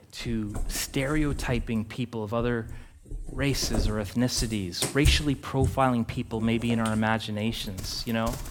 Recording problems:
animal sounds; loud; throughout; 8 dB below the speech

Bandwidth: 18 kHz